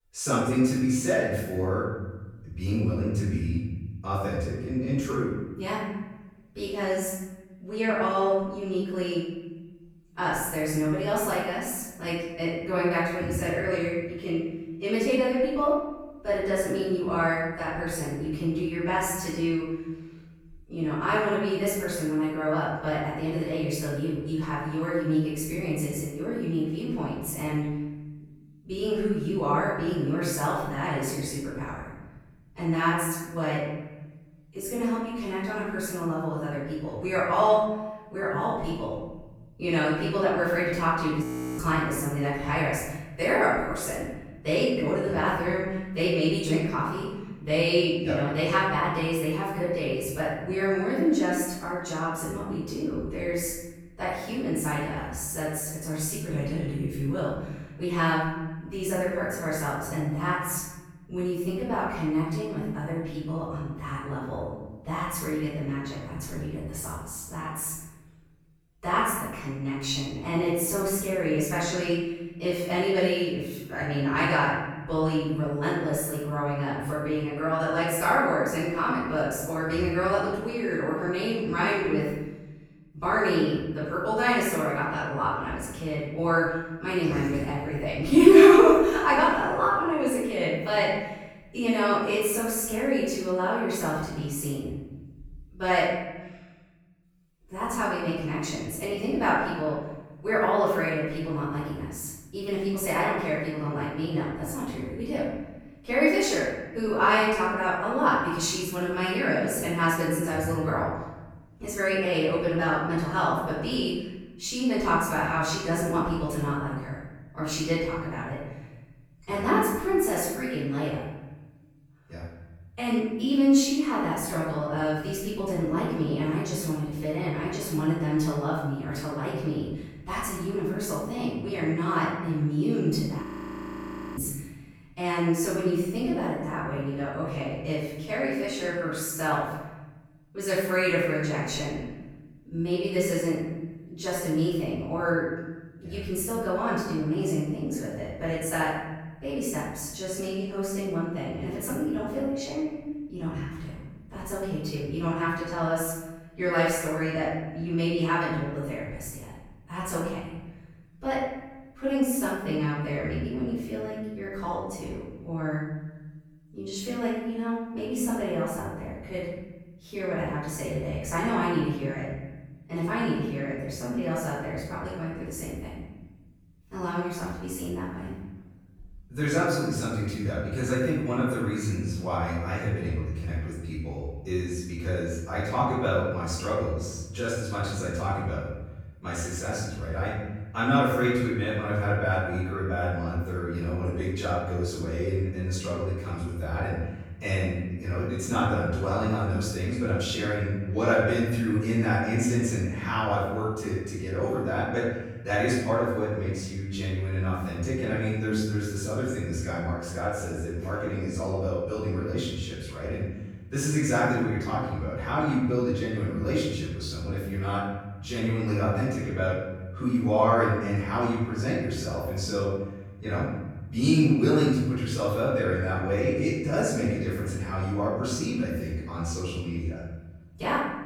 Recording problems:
room echo; strong; dies away in 1.4 s
off-mic speech; far
audio freezing; at 41 s and at 2:13 for 1 s

